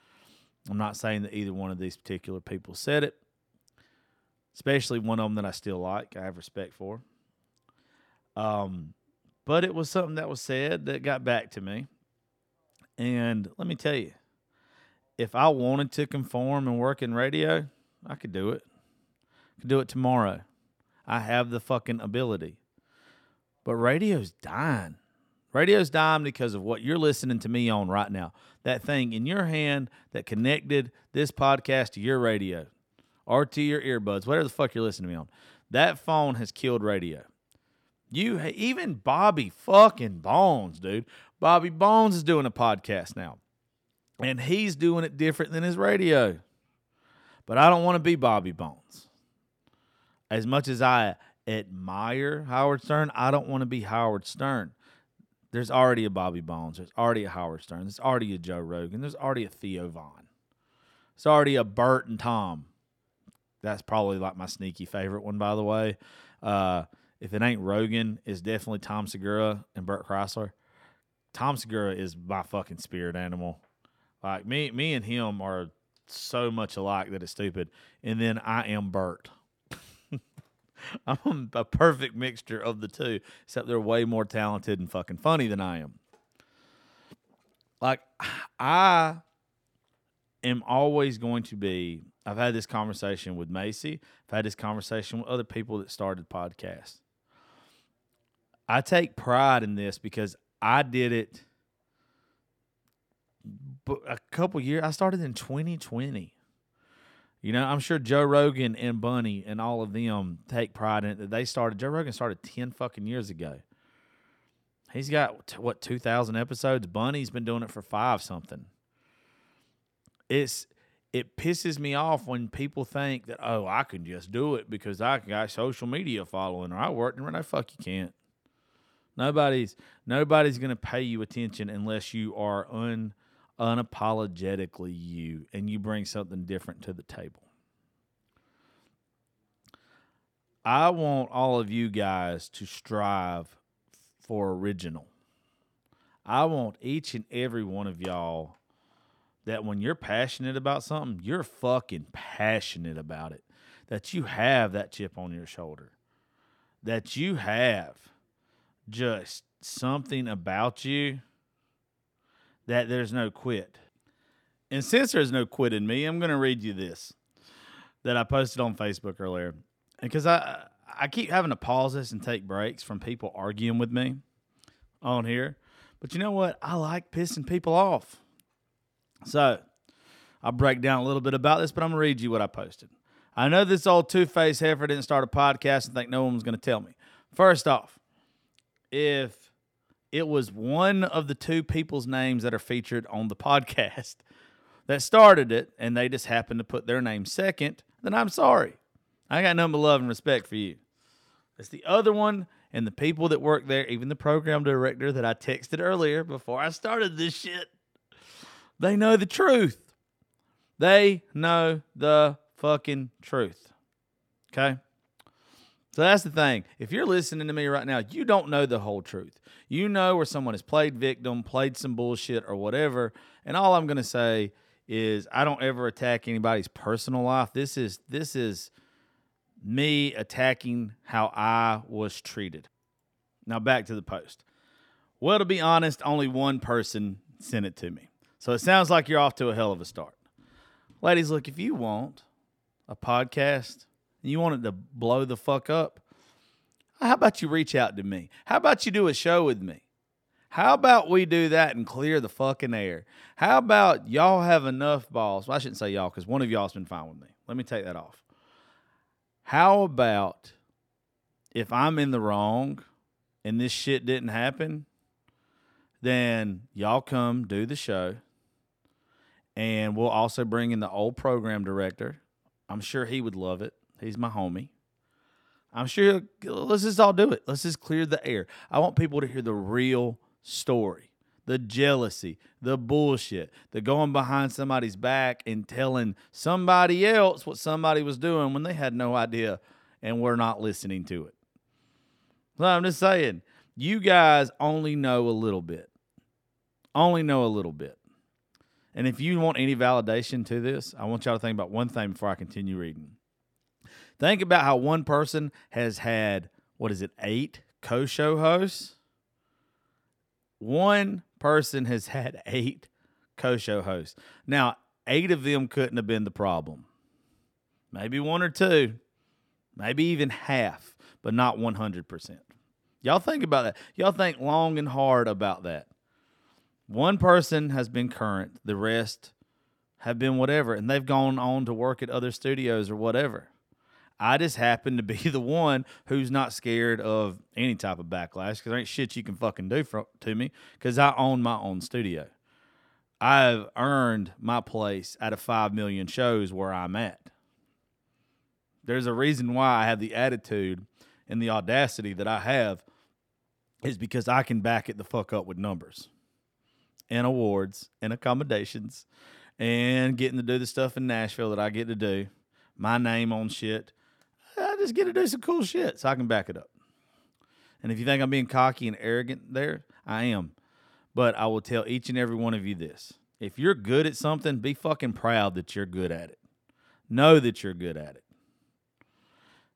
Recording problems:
none

